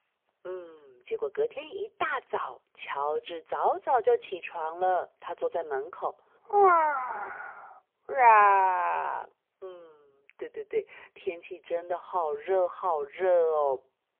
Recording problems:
phone-call audio; poor line; nothing above 3.5 kHz

